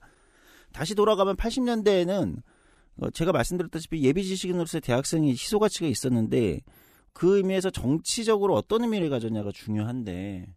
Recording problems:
none

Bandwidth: 15 kHz